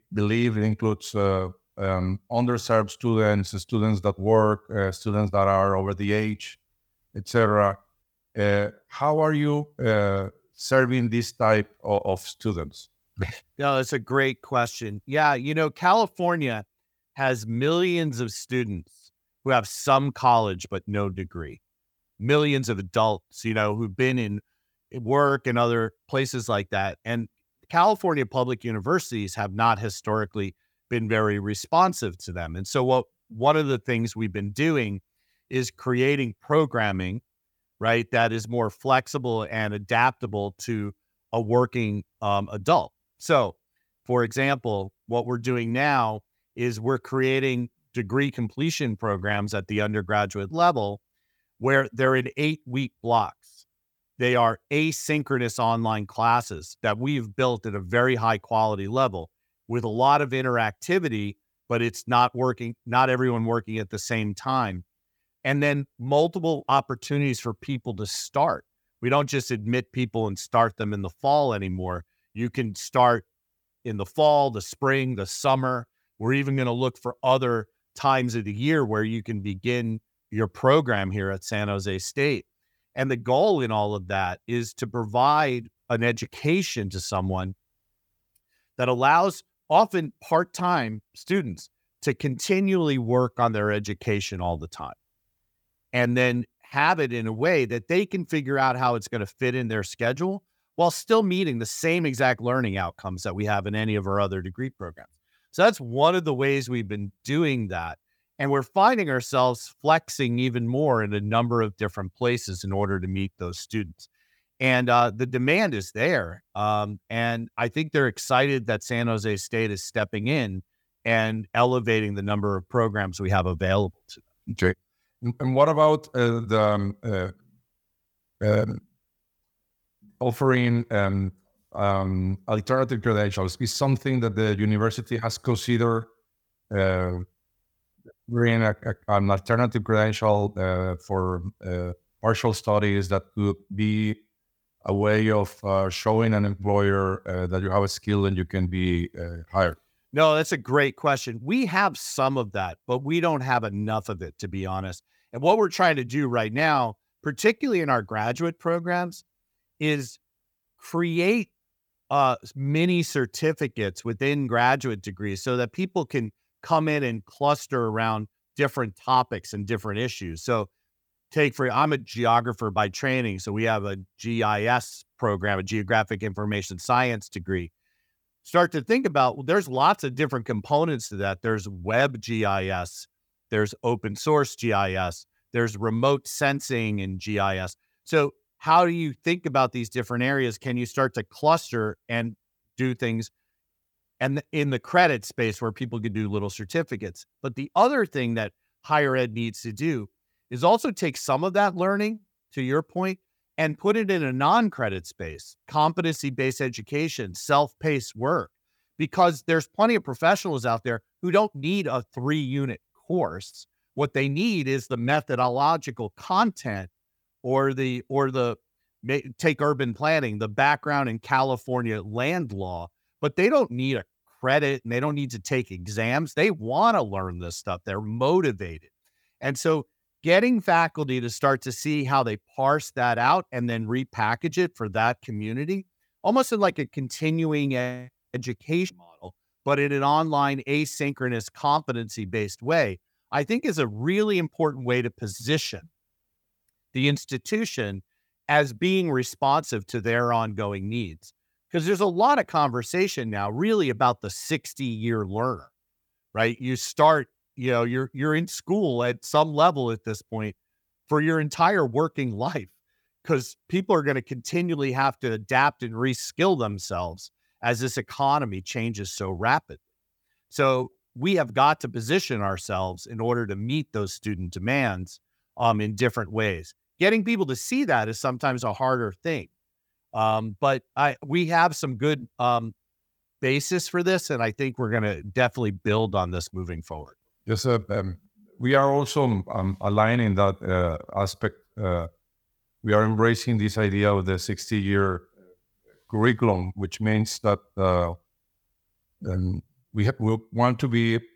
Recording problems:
none

